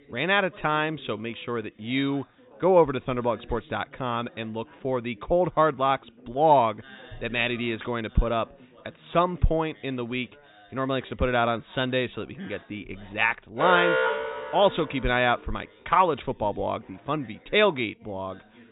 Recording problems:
high frequencies cut off; severe; nothing above 4 kHz
background chatter; faint; throughout; 3 voices, 25 dB below the speech
alarm; loud; from 14 to 15 s; peak 4 dB above the speech

